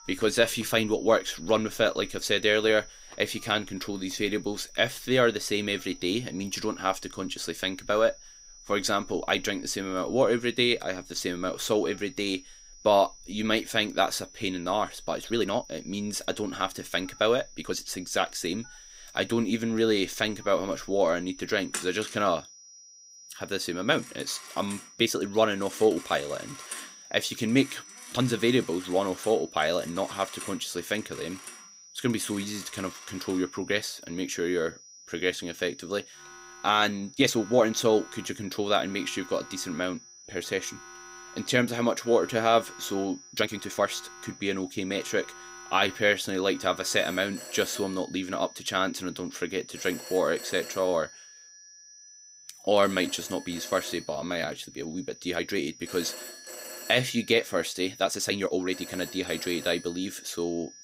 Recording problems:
high-pitched whine; noticeable; throughout; 6 kHz, 20 dB below the speech
alarms or sirens; noticeable; throughout; 15 dB below the speech
uneven, jittery; strongly; from 15 to 59 s

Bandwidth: 15.5 kHz